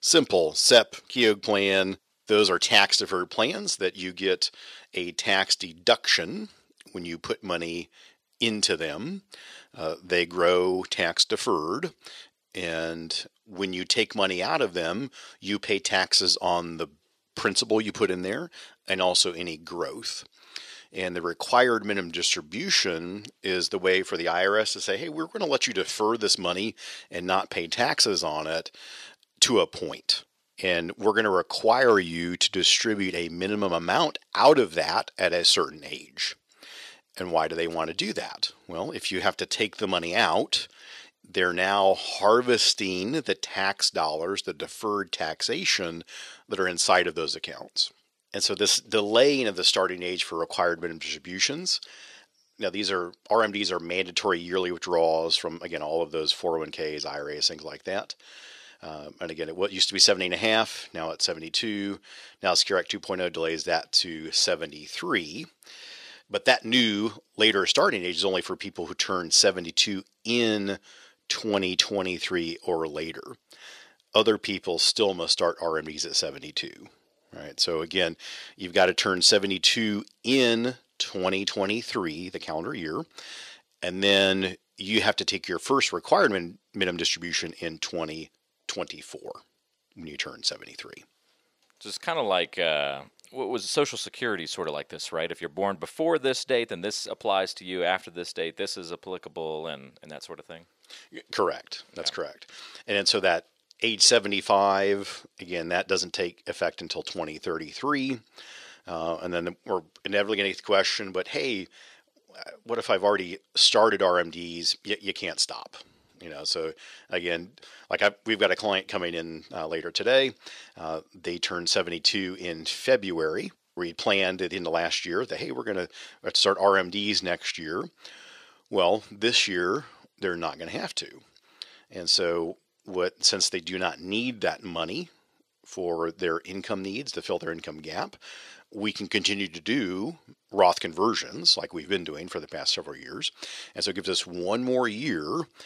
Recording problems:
thin; somewhat; fading below 400 Hz

